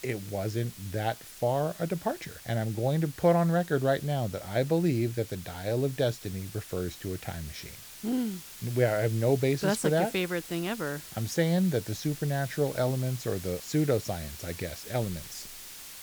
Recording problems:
hiss; noticeable; throughout; 15 dB below the speech

